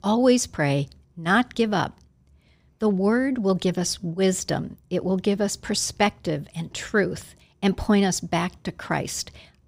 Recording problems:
none

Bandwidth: 15.5 kHz